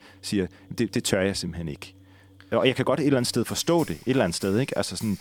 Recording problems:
background music; faint; throughout; 25 dB below the speech

